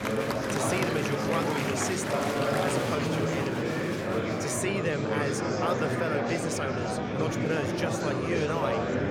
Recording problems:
murmuring crowd; very loud; throughout; 4 dB above the speech

